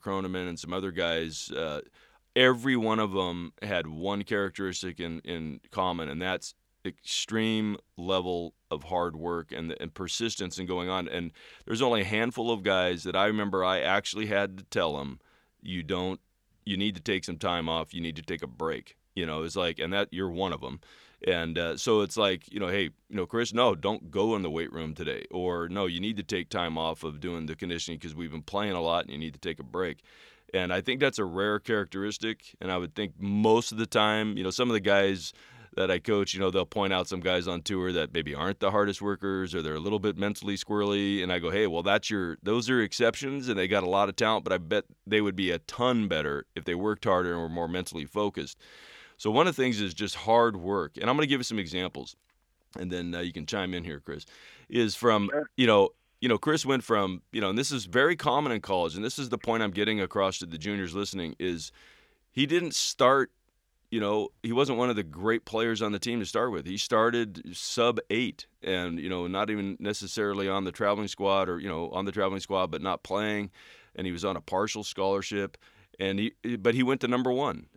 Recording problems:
none

